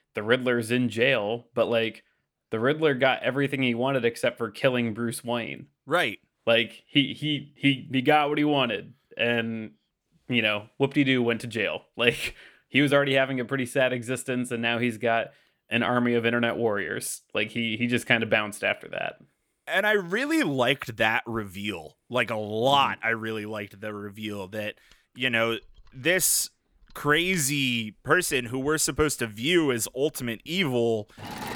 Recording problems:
machinery noise; faint; from 25 s on; 20 dB below the speech

